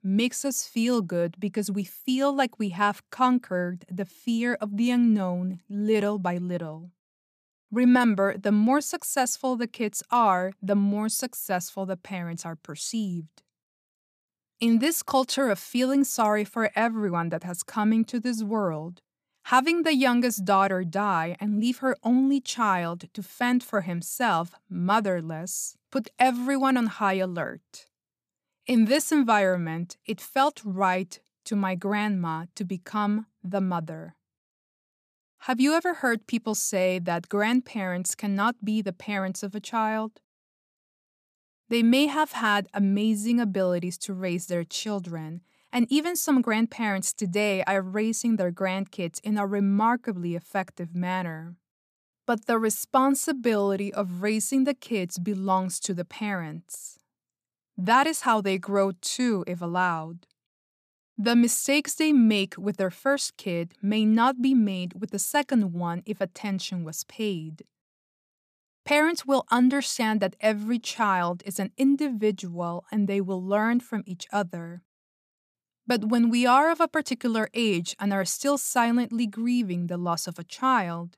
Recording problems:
none

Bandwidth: 14.5 kHz